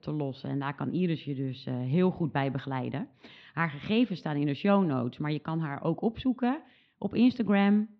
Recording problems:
muffled; slightly; fading above 4 kHz

